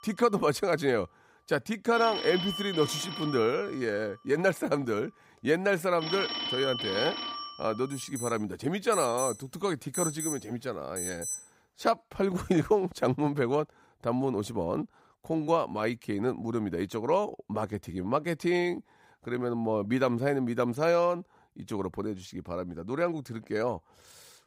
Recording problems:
alarms or sirens; loud; until 11 s; 5 dB below the speech

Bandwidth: 15.5 kHz